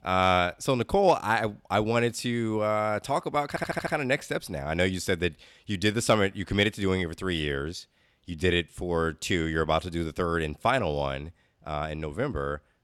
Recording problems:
audio stuttering; at 3.5 s

